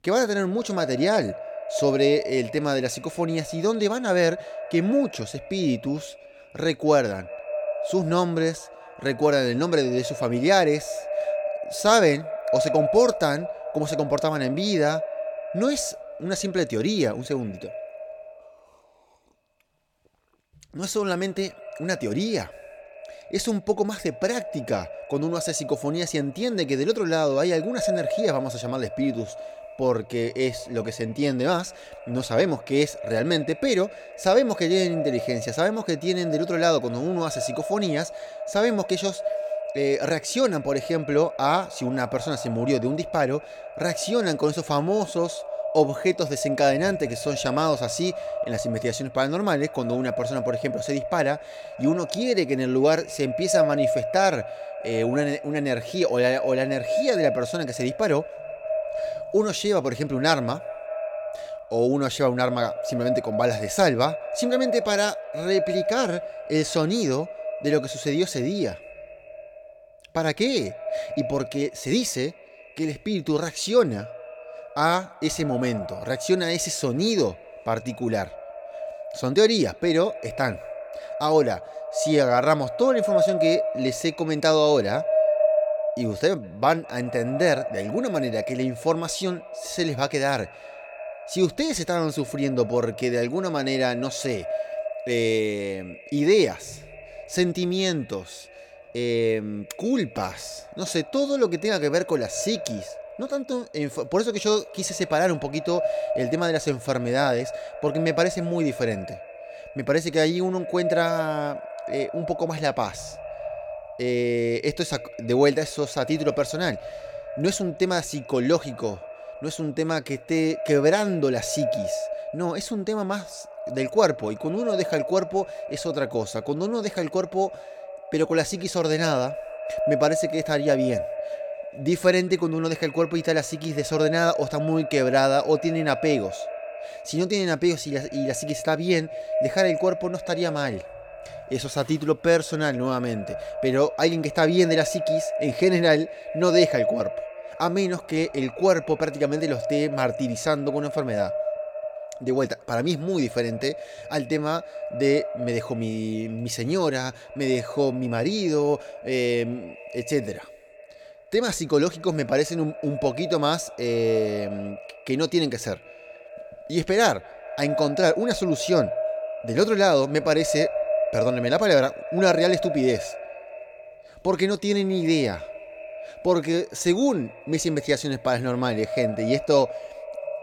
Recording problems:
echo of what is said; strong; throughout; 200 ms later, 8 dB below the speech

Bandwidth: 17 kHz